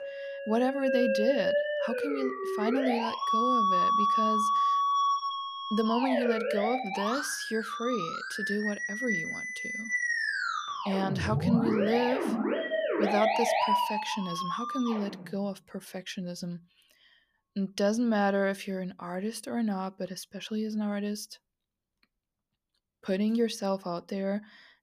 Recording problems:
background music; very loud; throughout; 2 dB above the speech

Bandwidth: 15 kHz